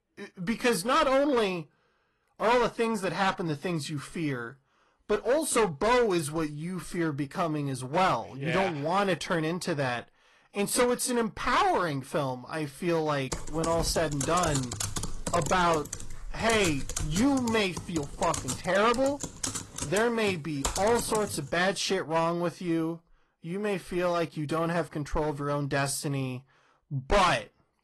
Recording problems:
distortion; heavy; 6% of the sound clipped
garbled, watery; slightly; nothing above 11.5 kHz
keyboard typing; noticeable; from 13 to 21 s; peak 4 dB below the speech

